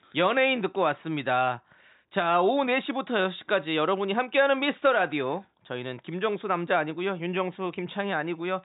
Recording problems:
high frequencies cut off; severe; nothing above 4 kHz

